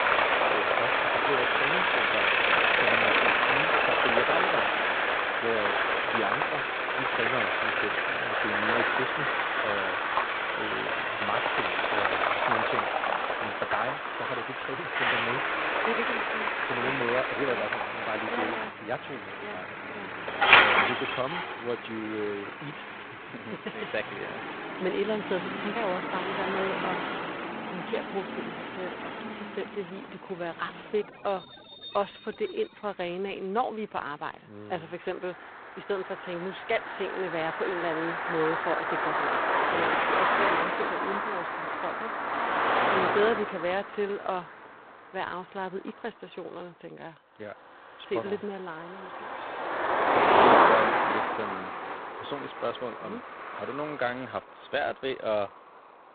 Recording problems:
phone-call audio; poor line; nothing above 4 kHz
traffic noise; very loud; throughout; 8 dB above the speech
footsteps; loud; at 10 s; peak 2 dB above the speech
jangling keys; faint; at 49 s; peak 15 dB below the speech

